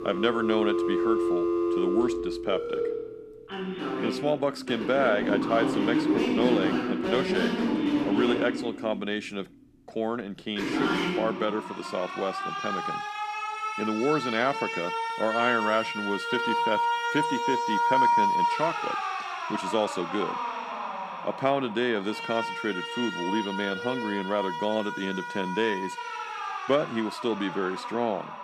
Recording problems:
alarms or sirens; very loud; throughout; 1 dB above the speech

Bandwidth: 14.5 kHz